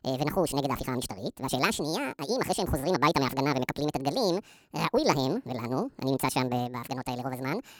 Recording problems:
wrong speed and pitch; too fast and too high; 1.7 times normal speed

